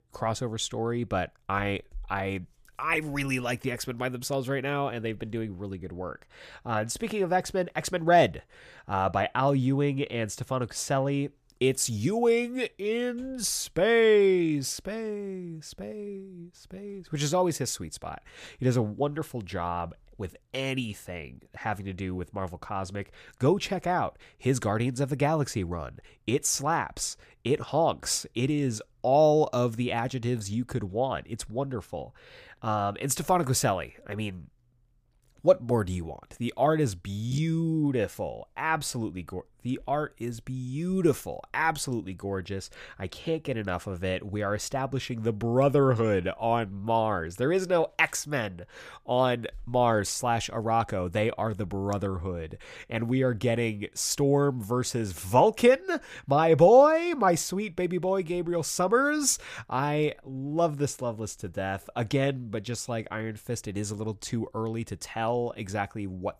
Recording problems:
none

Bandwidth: 15 kHz